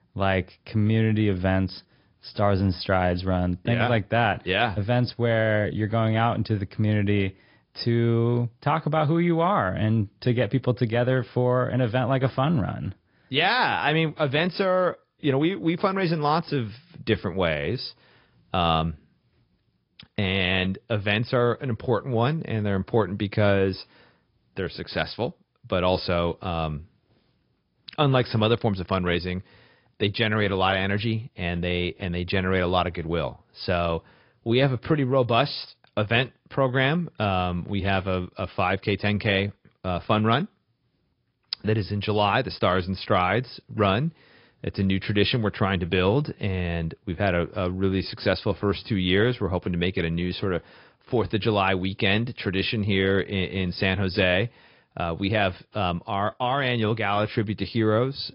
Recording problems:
high frequencies cut off; noticeable; nothing above 5 kHz
garbled, watery; slightly

